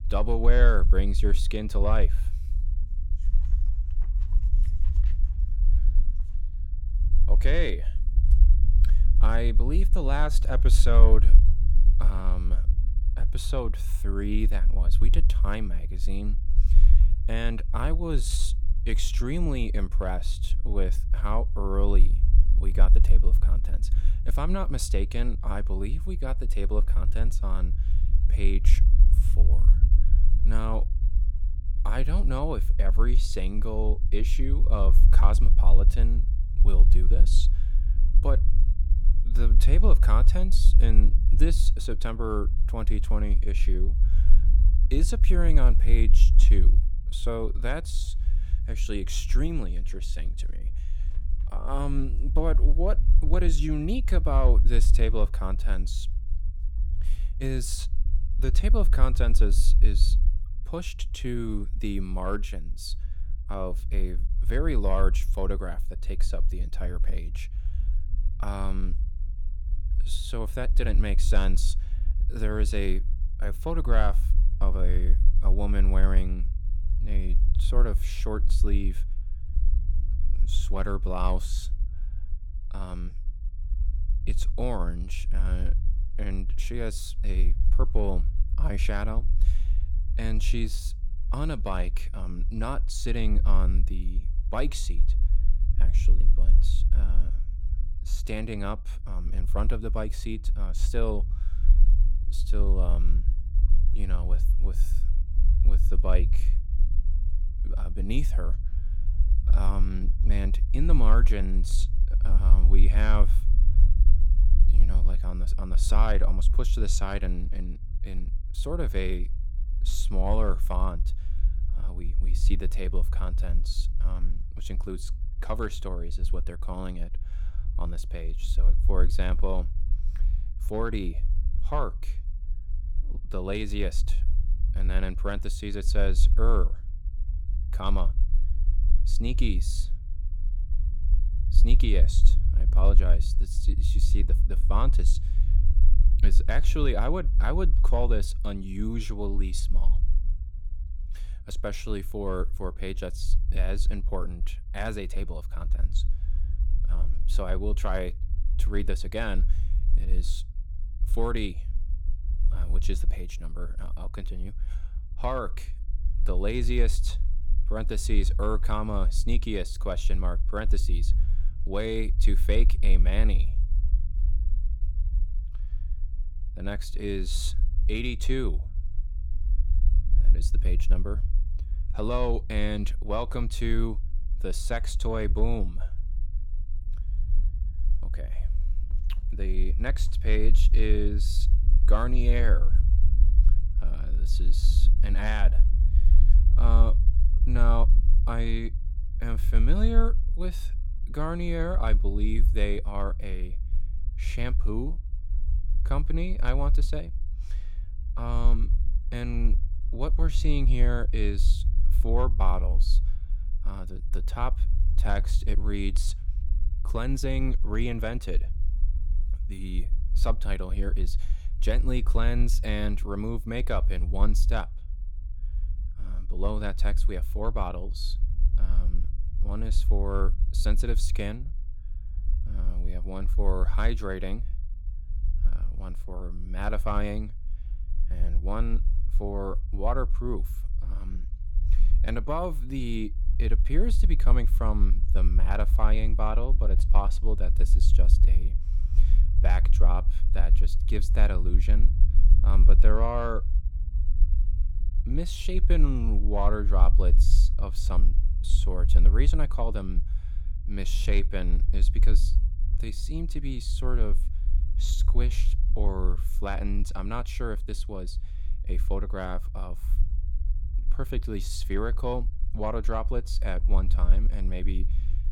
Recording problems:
low rumble; noticeable; throughout; 15 dB below the speech

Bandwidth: 17.5 kHz